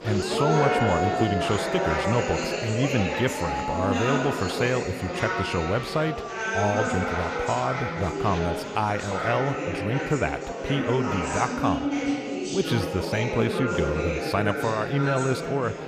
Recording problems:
chatter from many people; loud; throughout; 1 dB below the speech

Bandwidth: 15 kHz